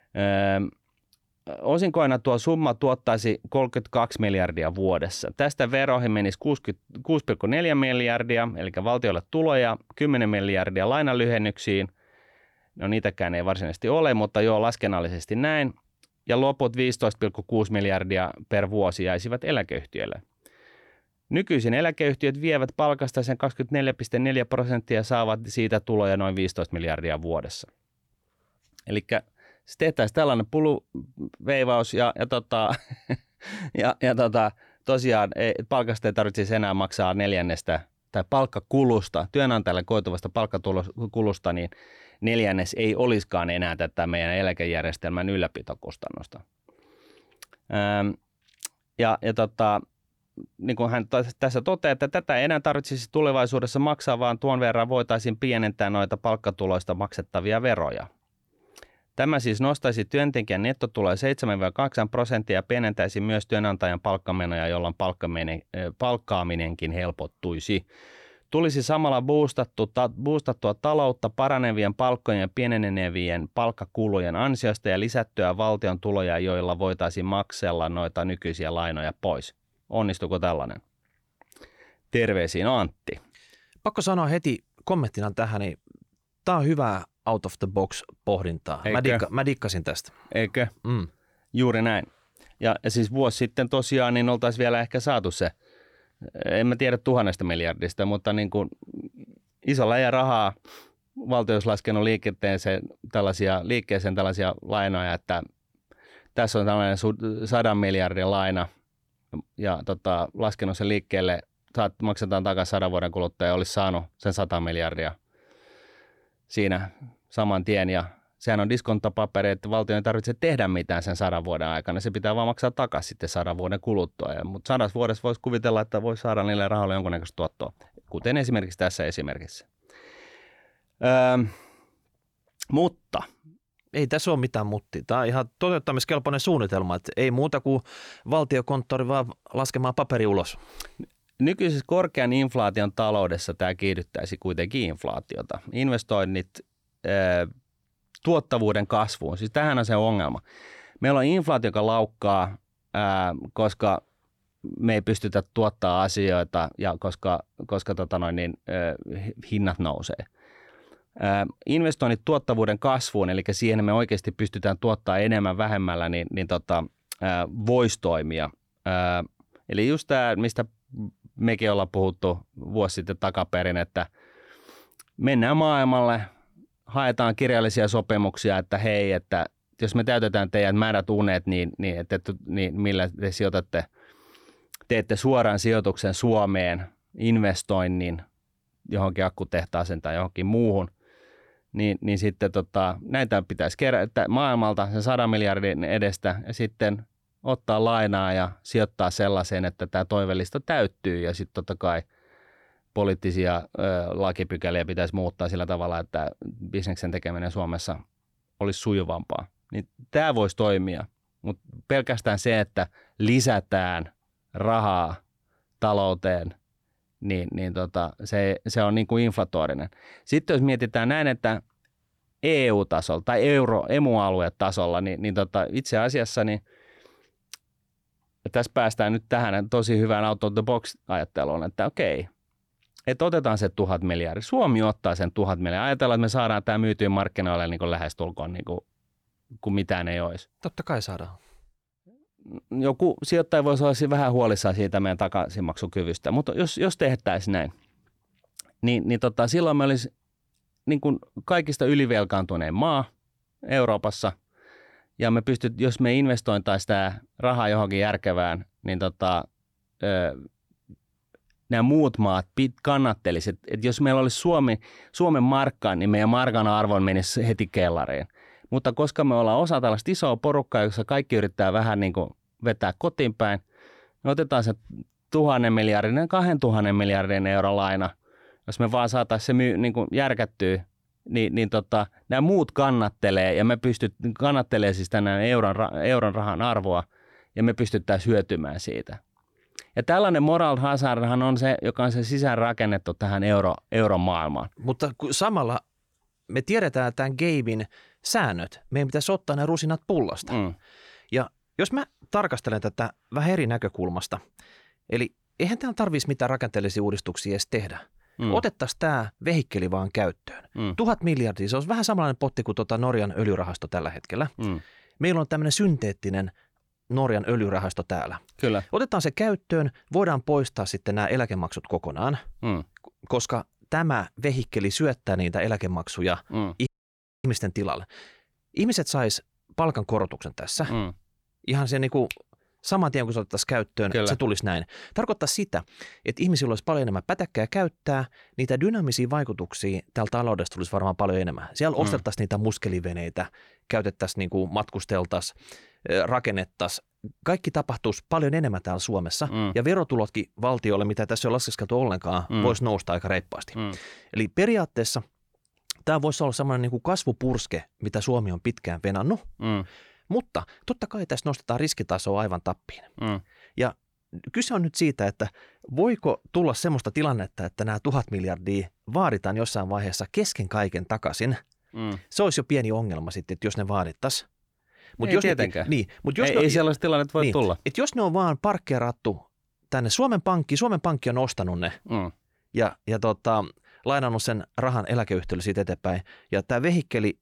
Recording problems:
audio cutting out; at 5:27 for 0.5 s

